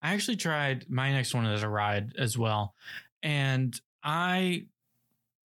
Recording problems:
none

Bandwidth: 18.5 kHz